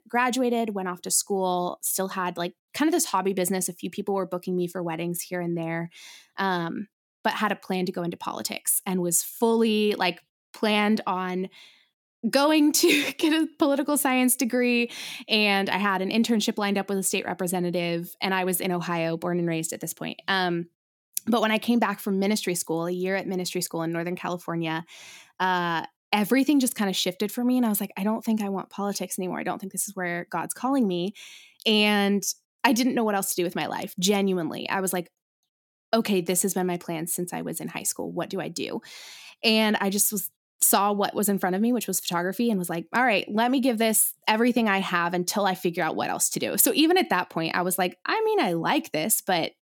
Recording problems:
none

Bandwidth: 17 kHz